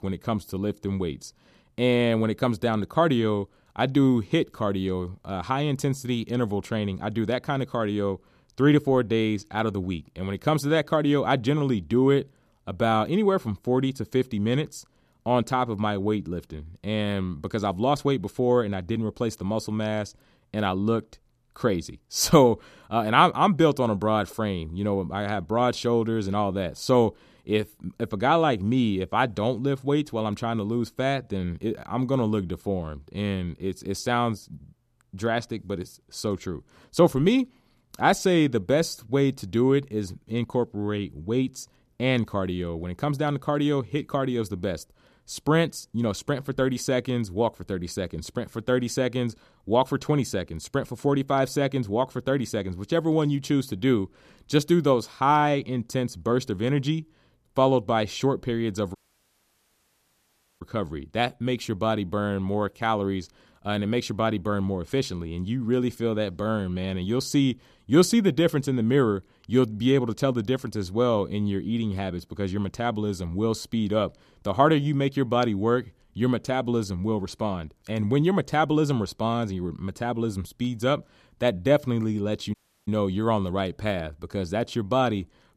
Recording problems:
audio cutting out; at 59 s for 1.5 s and at 1:23

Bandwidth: 14.5 kHz